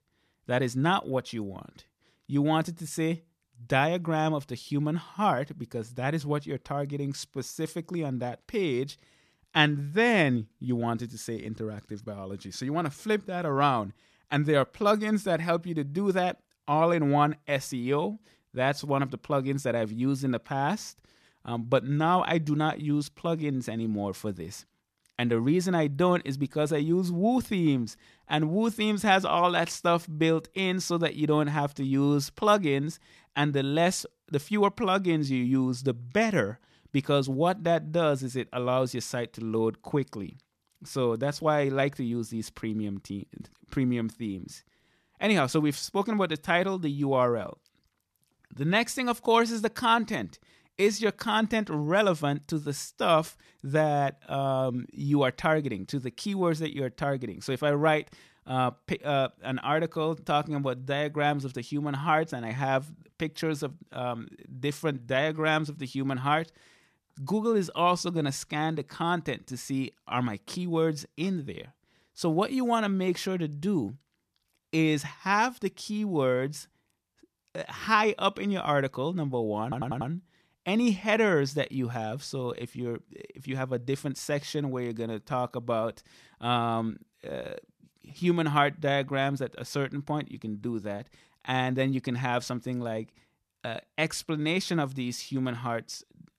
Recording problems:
audio stuttering; at 1:20

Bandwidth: 14 kHz